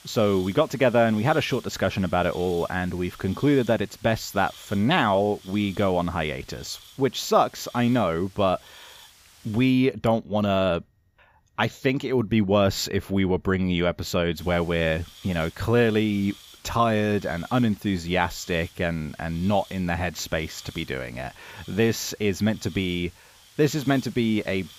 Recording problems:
hiss; faint; until 9.5 s and from 14 s on; 20 dB below the speech

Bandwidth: 15 kHz